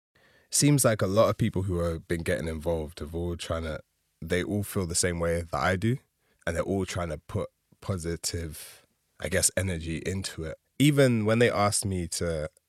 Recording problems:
none

